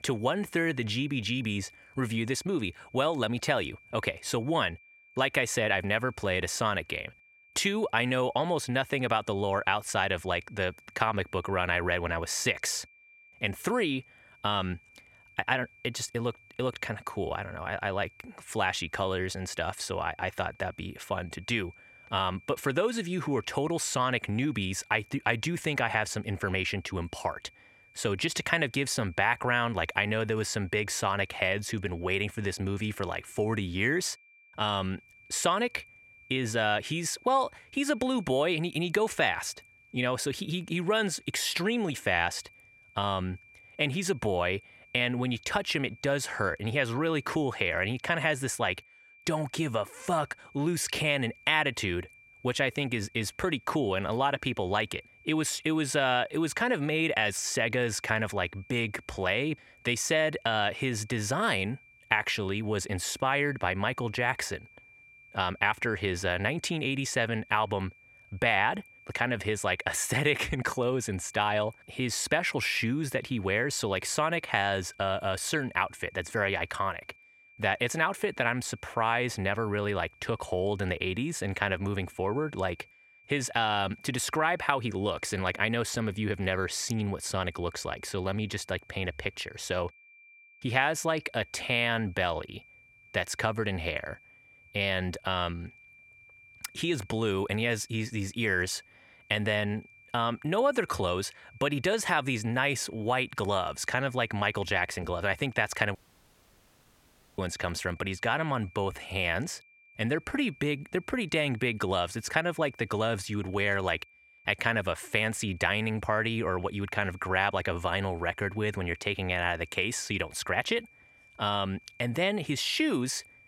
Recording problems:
high-pitched whine; faint; throughout; 2.5 kHz, 25 dB below the speech
audio cutting out; at 1:46 for 1.5 s

